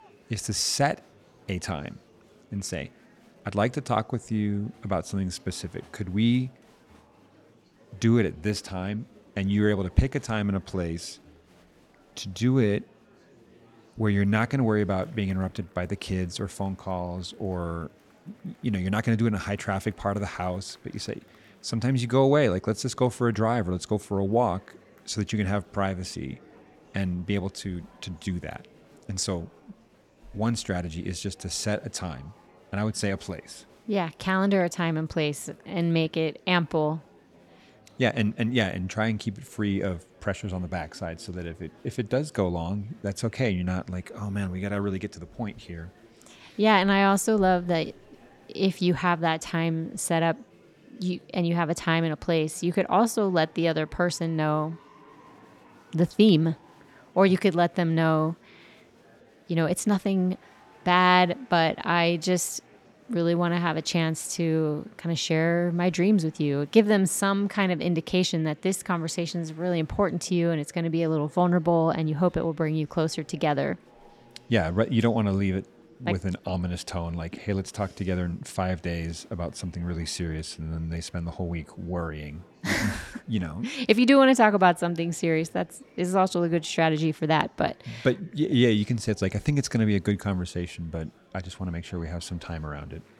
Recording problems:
murmuring crowd; faint; throughout; 30 dB below the speech

